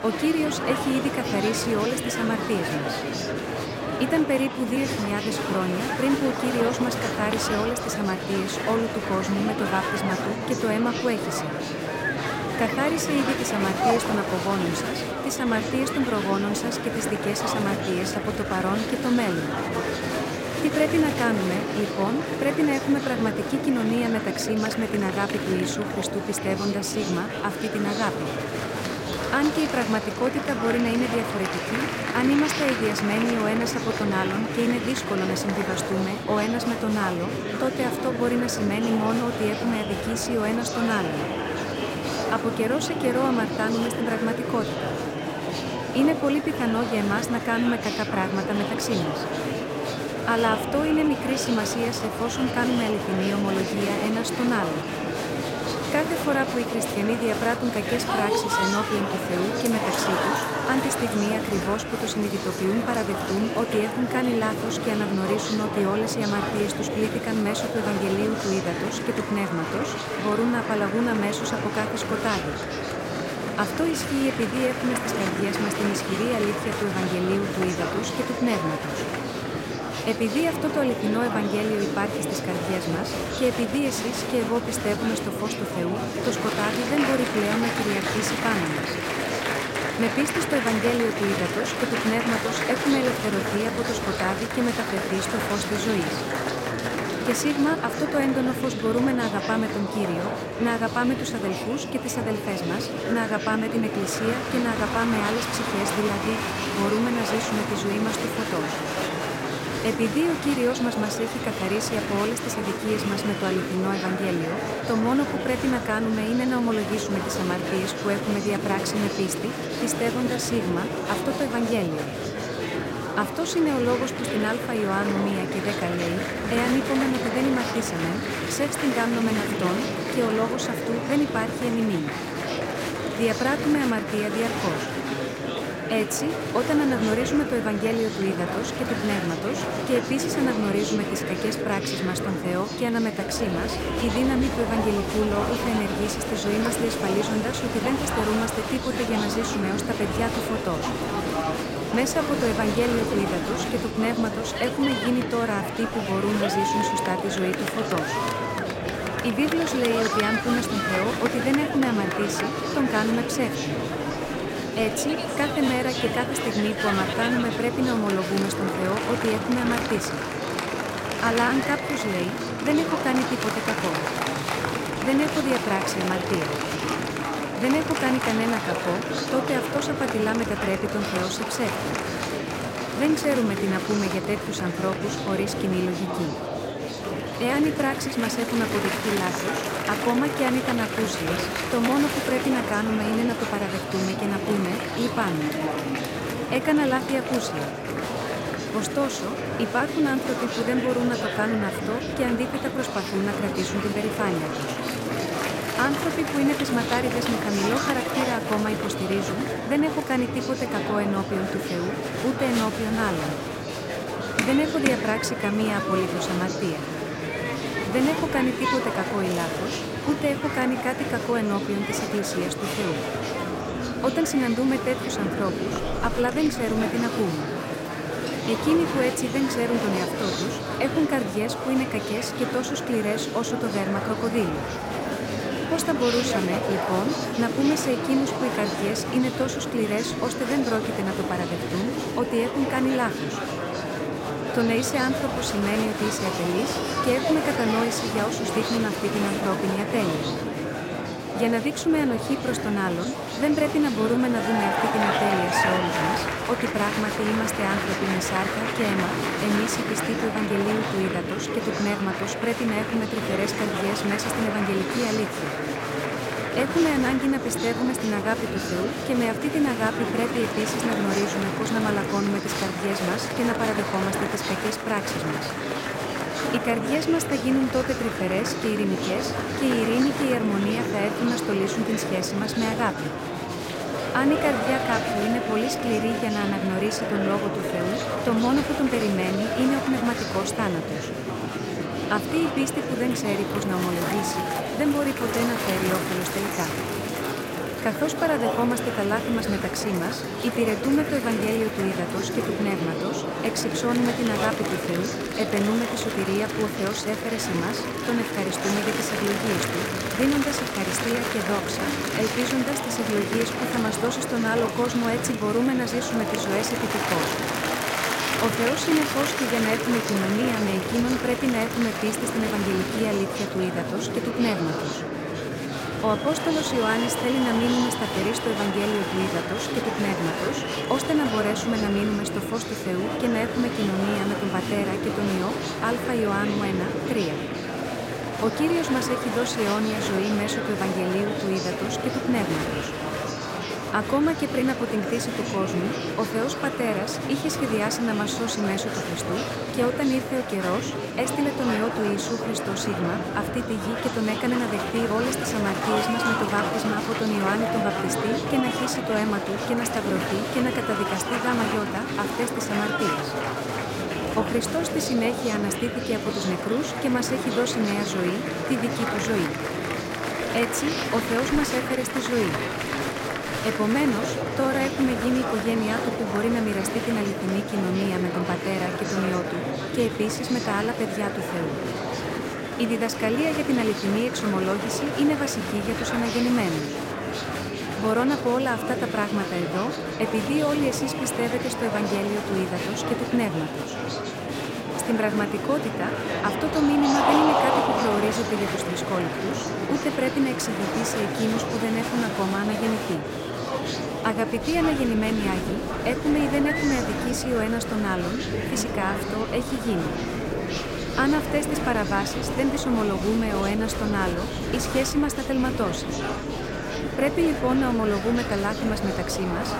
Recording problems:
murmuring crowd; loud; throughout; 2 dB below the speech

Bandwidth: 16 kHz